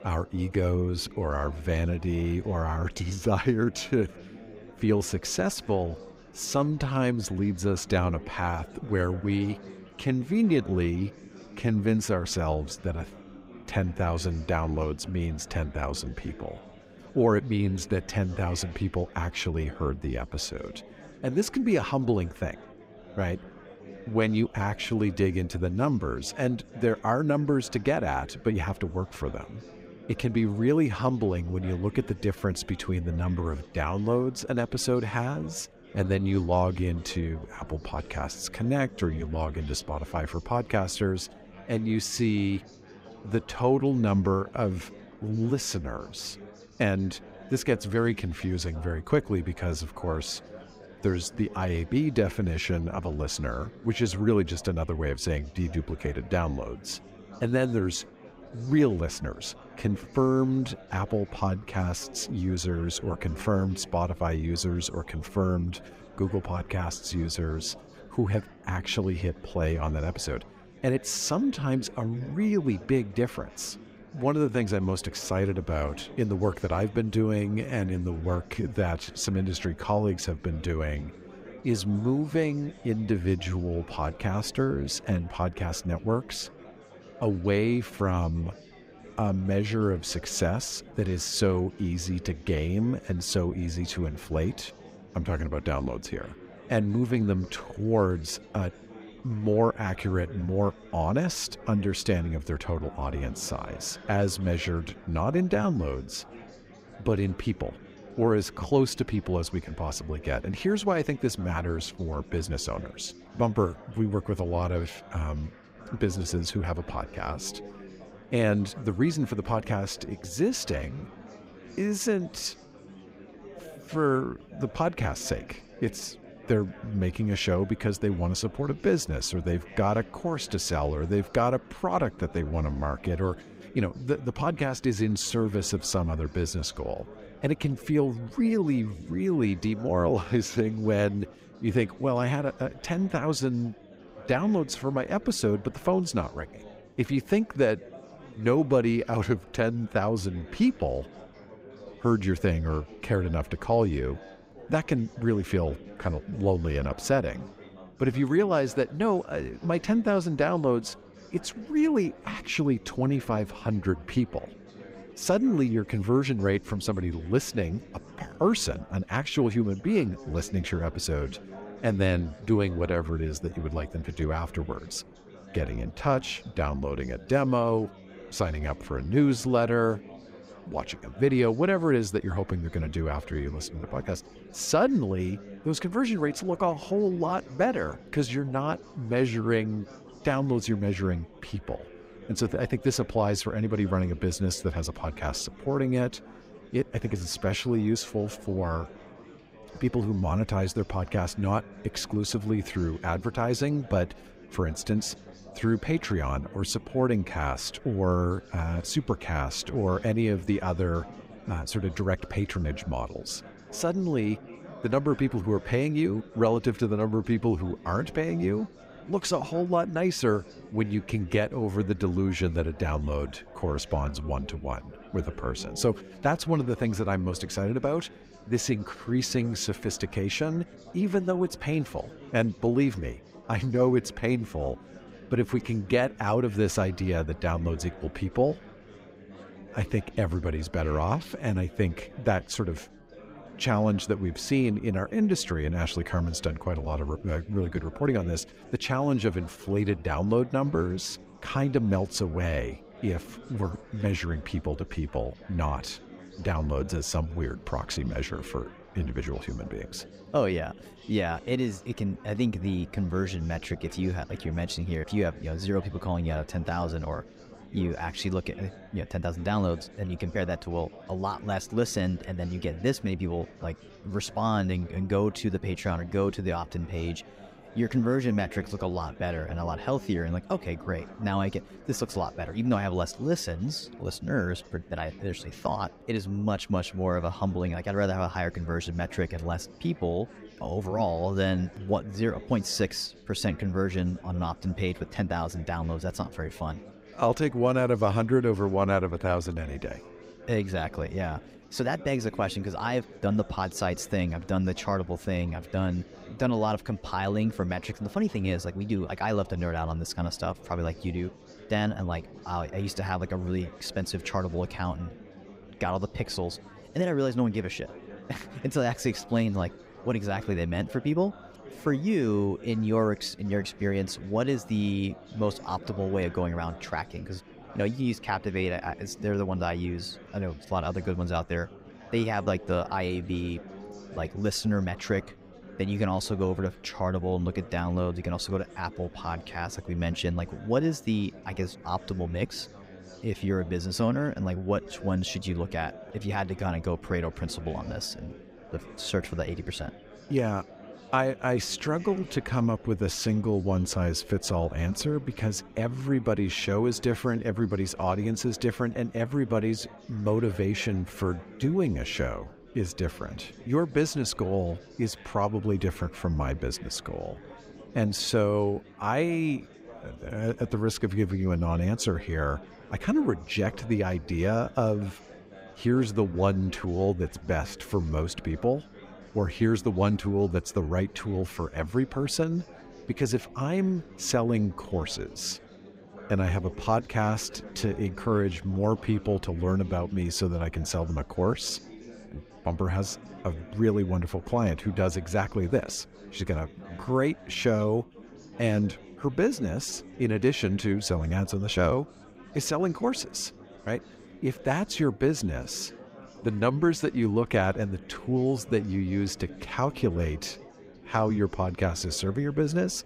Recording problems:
chatter from many people; noticeable; throughout; 20 dB below the speech

